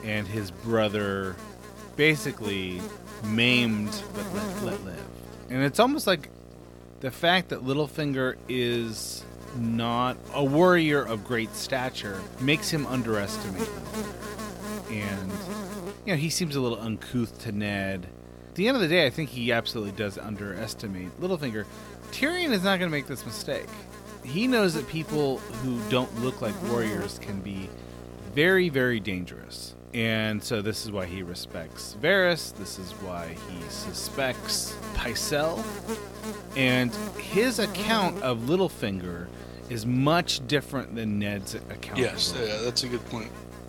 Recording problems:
electrical hum; noticeable; throughout; 60 Hz, 15 dB below the speech

